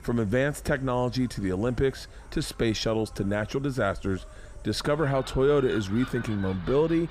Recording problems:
animal sounds; noticeable; throughout; 15 dB below the speech

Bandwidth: 15 kHz